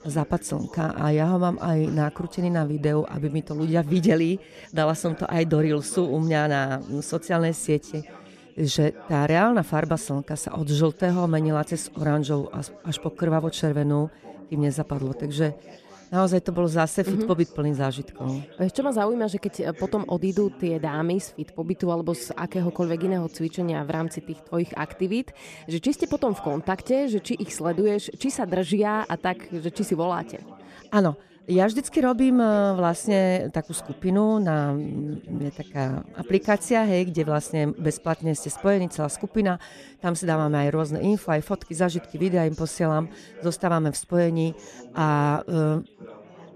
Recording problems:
background chatter; faint; throughout; 4 voices, 20 dB below the speech

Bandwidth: 14.5 kHz